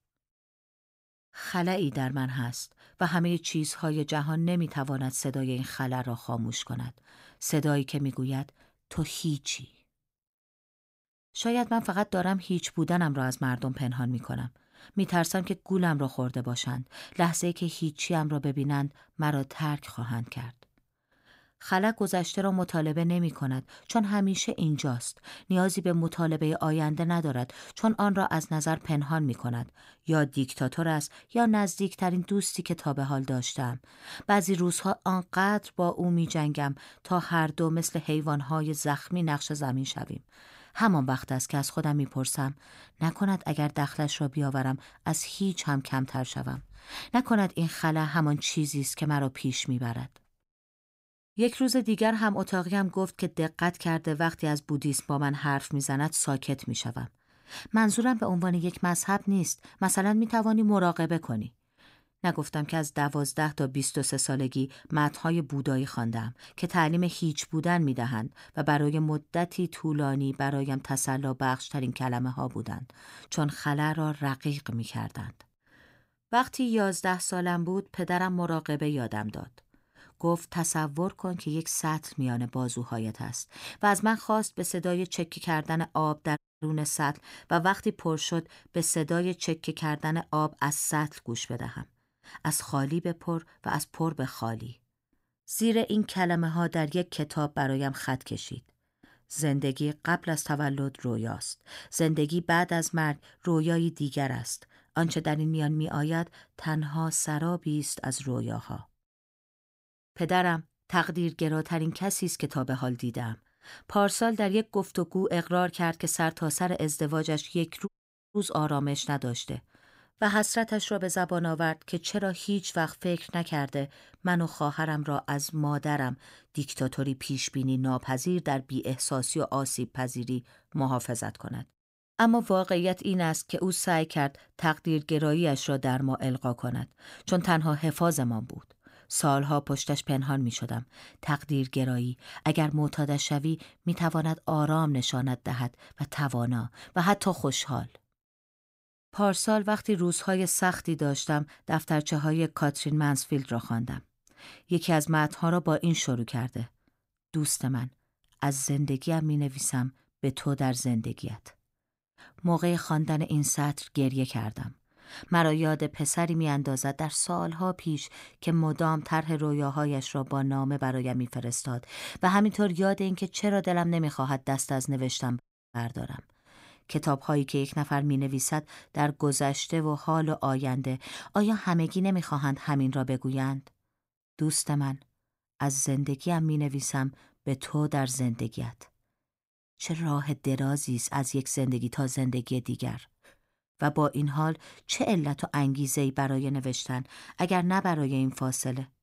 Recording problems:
audio cutting out; at 1:26, at 1:58 and at 2:55

